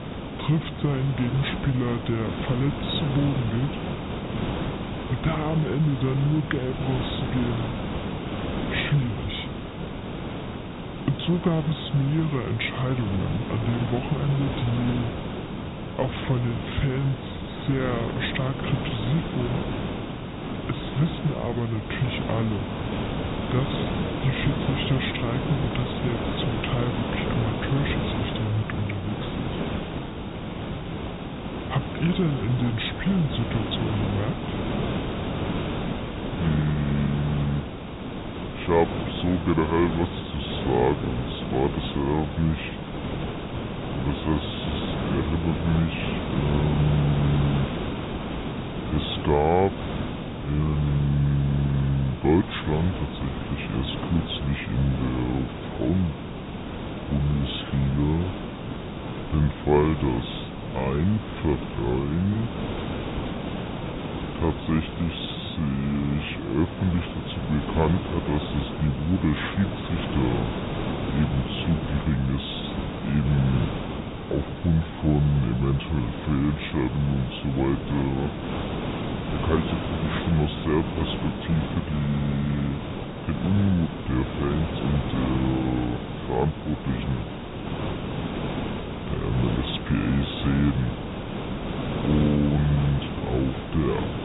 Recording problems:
high frequencies cut off; severe; nothing above 4 kHz
wrong speed and pitch; too slow and too low; 0.7 times normal speed
hiss; loud; throughout; 5 dB below the speech

